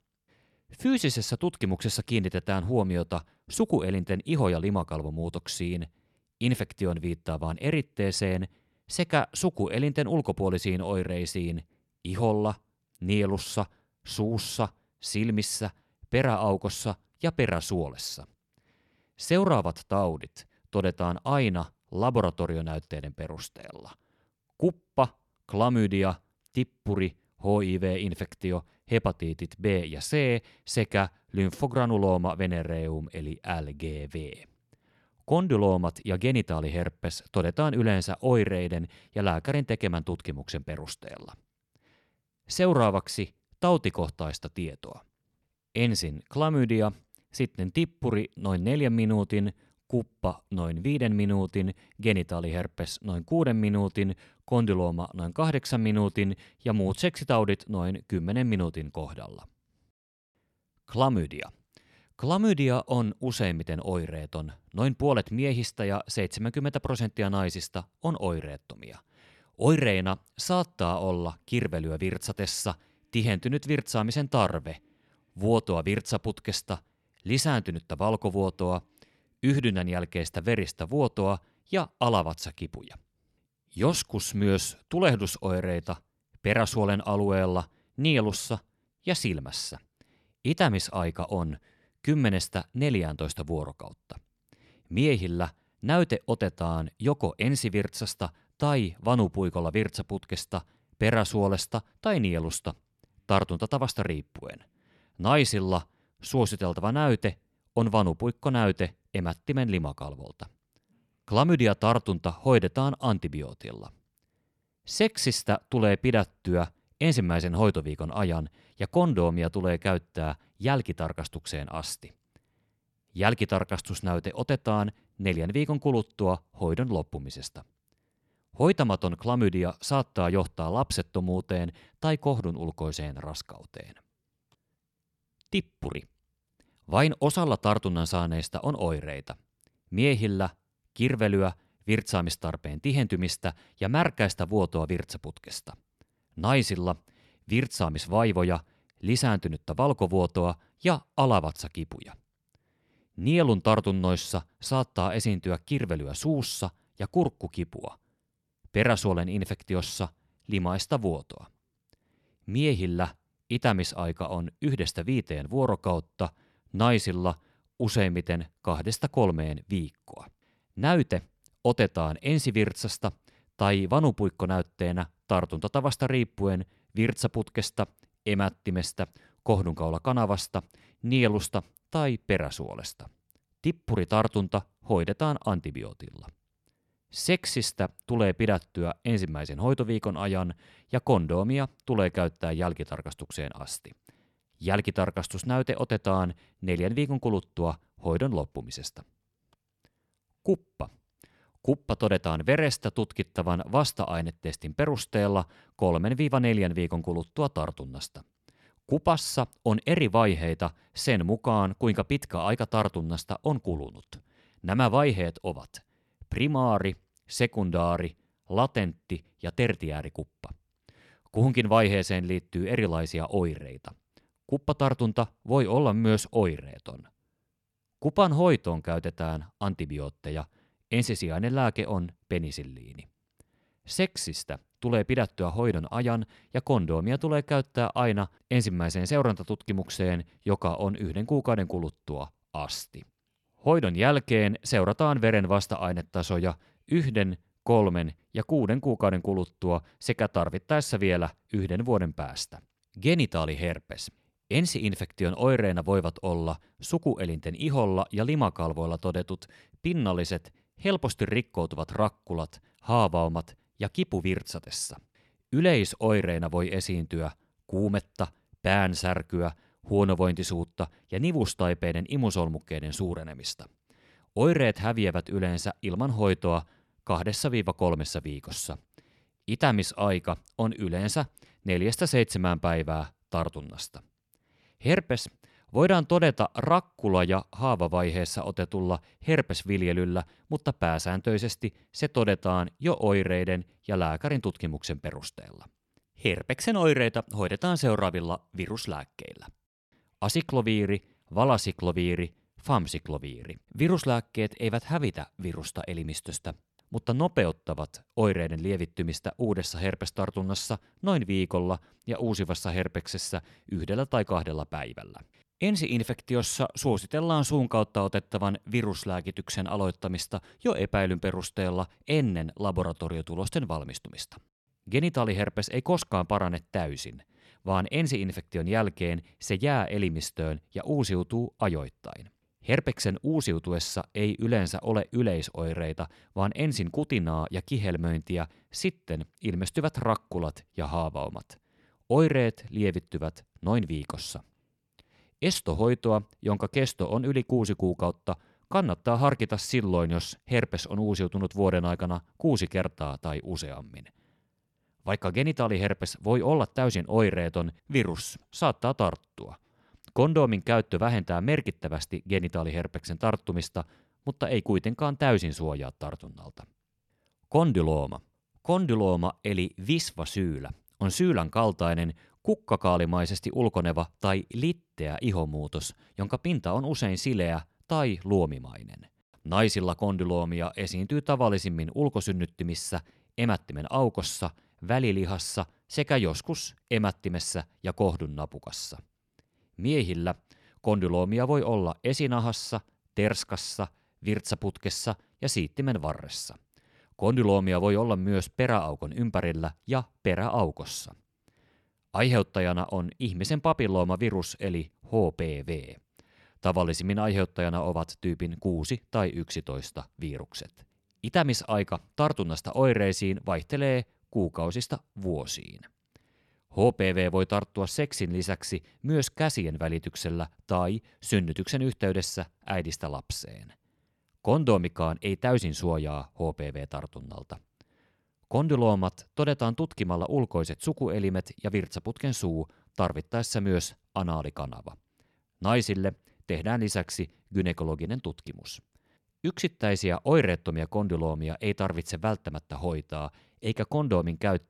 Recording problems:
none

